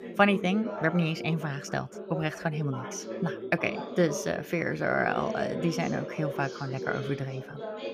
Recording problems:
background chatter; loud; throughout; 3 voices, 8 dB below the speech

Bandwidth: 15 kHz